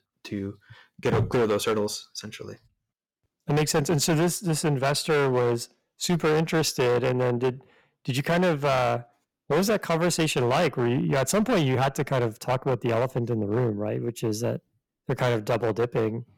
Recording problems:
distortion; heavy; 13% of the sound clipped

